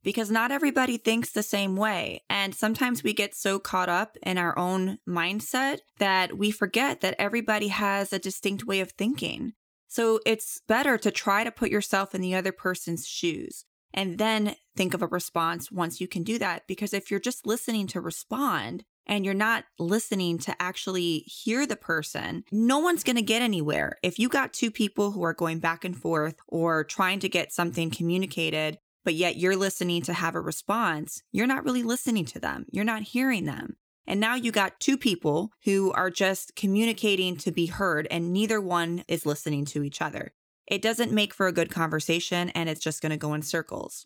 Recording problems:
none

